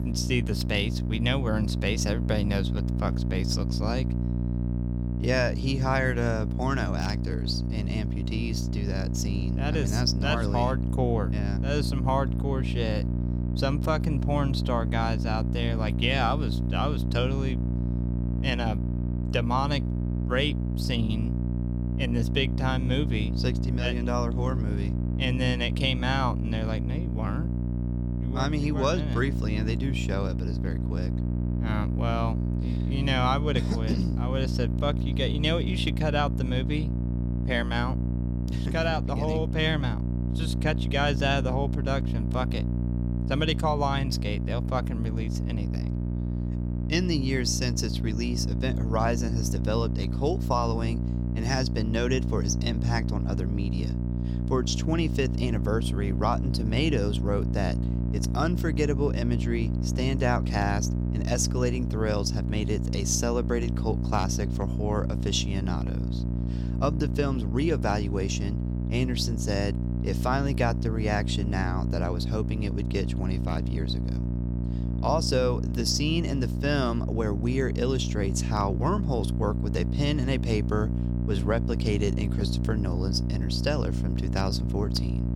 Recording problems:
electrical hum; loud; throughout; 60 Hz, 8 dB below the speech

